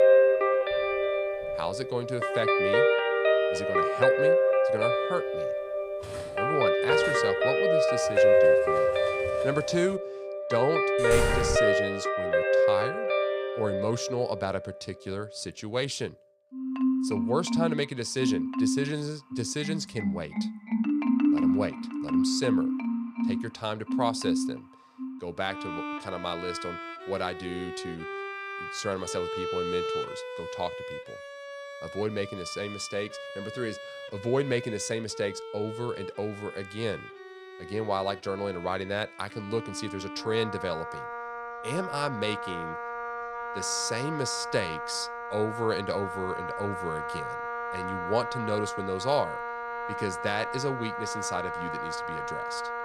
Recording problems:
background music; very loud; throughout; 4 dB above the speech
clattering dishes; faint; from 0.5 to 10 s; peak 10 dB below the speech
door banging; loud; at 11 s; peak 3 dB above the speech

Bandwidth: 15.5 kHz